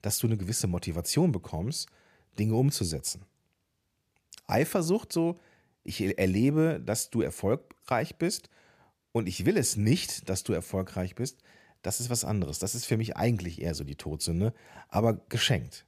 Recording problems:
none

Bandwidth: 14.5 kHz